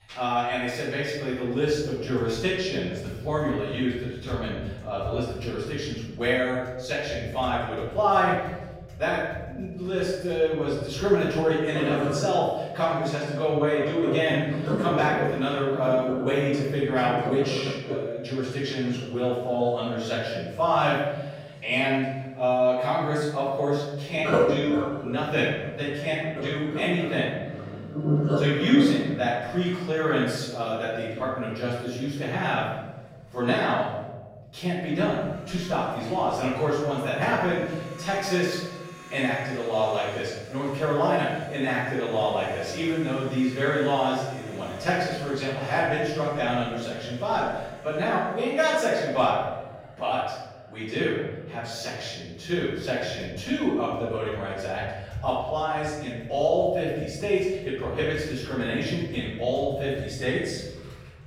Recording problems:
room echo; strong; dies away in 1.4 s
off-mic speech; far
household noises; loud; throughout; 8 dB below the speech

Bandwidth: 16 kHz